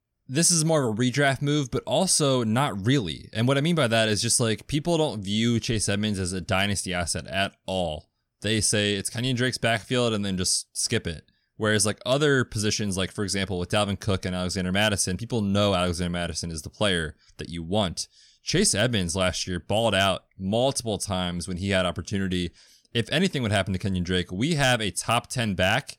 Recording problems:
none

